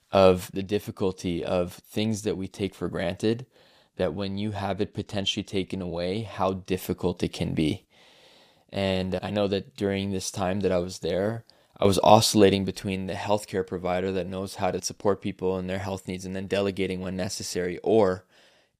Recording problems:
none

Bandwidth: 15 kHz